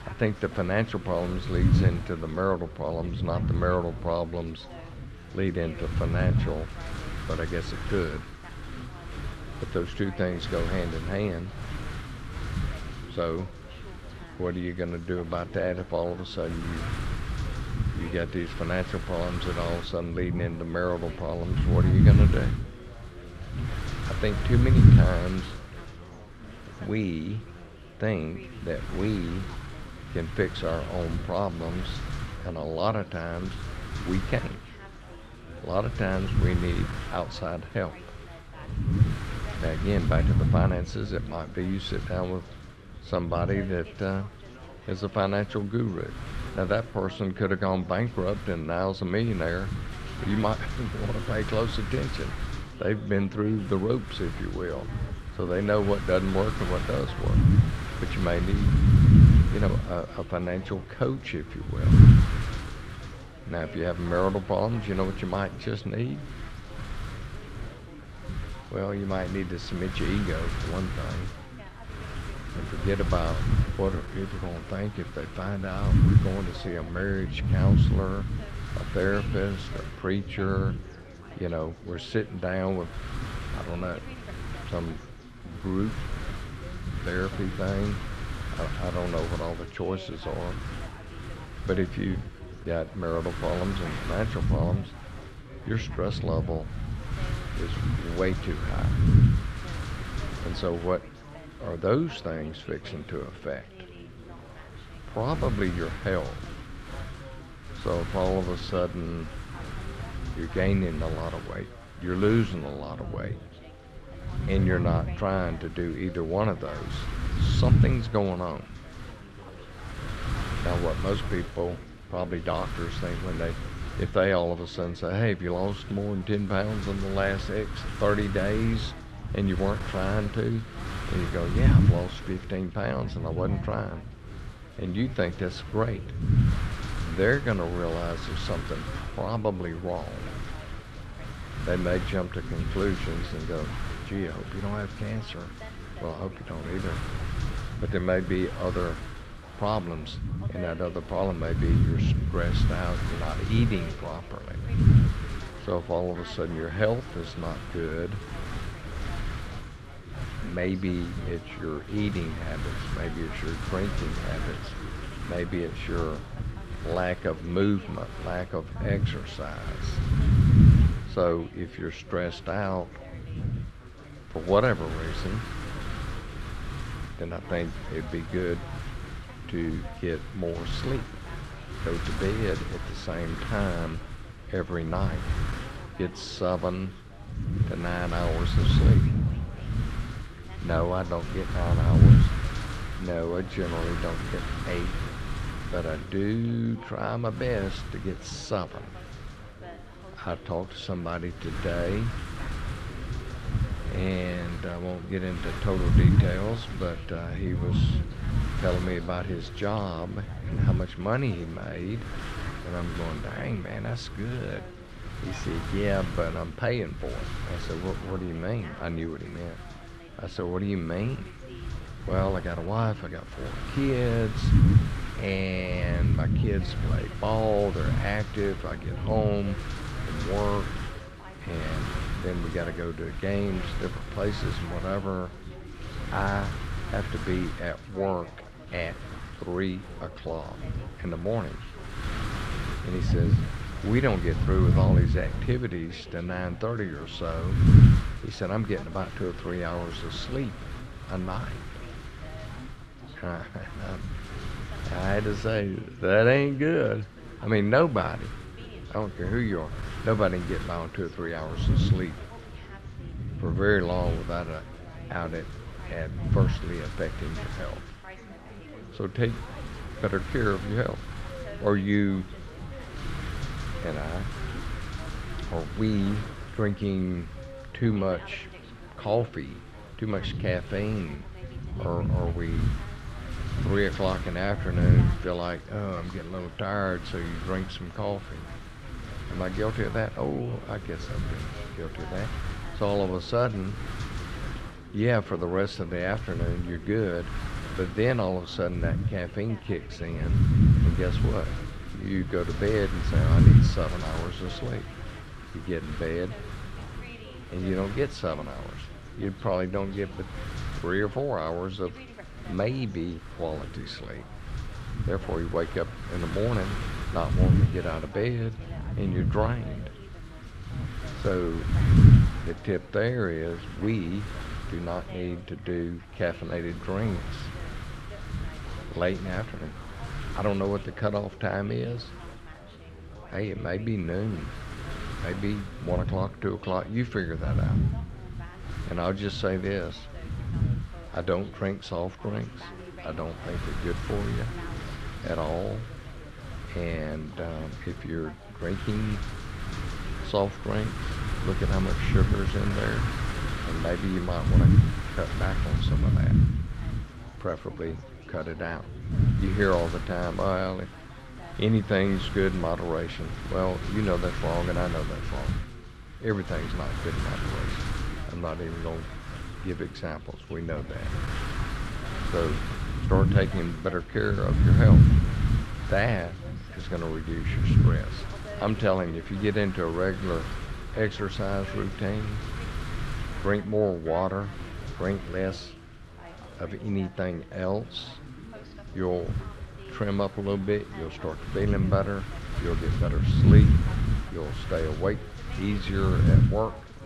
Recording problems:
muffled; slightly; fading above 3 kHz
wind noise on the microphone; heavy; 7 dB below the speech
background chatter; noticeable; throughout; 4 voices, 15 dB below the speech

